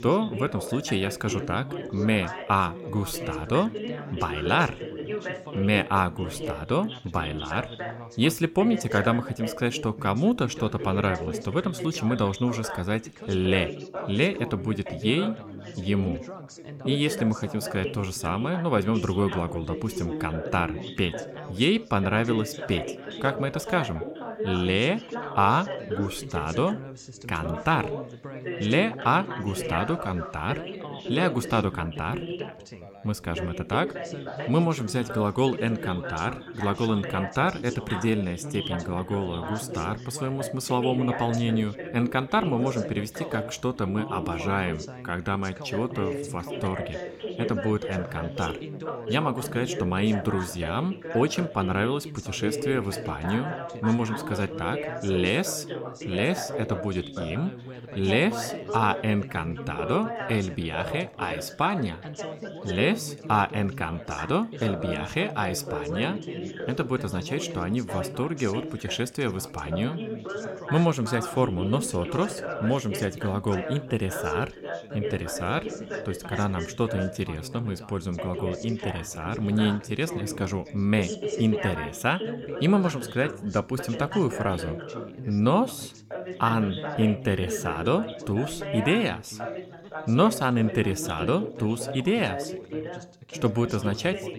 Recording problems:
background chatter; loud; throughout; 4 voices, 8 dB below the speech

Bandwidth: 16.5 kHz